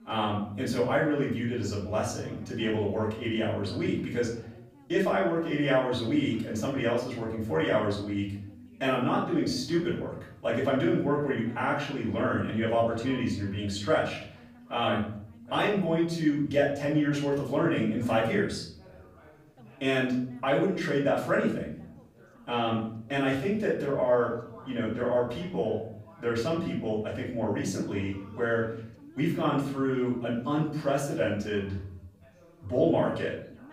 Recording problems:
off-mic speech; far
room echo; noticeable; dies away in 0.6 s
background chatter; faint; throughout; 3 voices, 25 dB below the speech

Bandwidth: 15.5 kHz